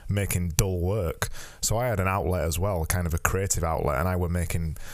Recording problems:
squashed, flat; heavily

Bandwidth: 15 kHz